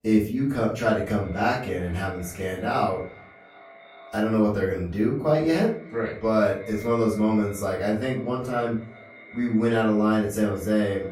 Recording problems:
off-mic speech; far
echo of what is said; faint; throughout; 360 ms later, 20 dB below the speech
room echo; slight; dies away in 0.4 s

